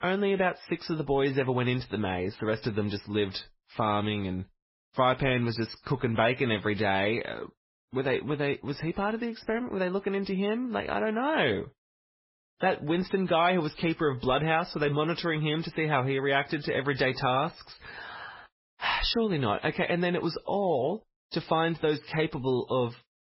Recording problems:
garbled, watery; badly; nothing above 5.5 kHz

